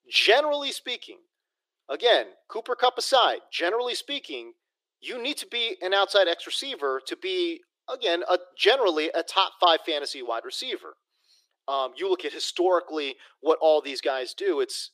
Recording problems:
thin; very; fading below 350 Hz

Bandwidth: 15 kHz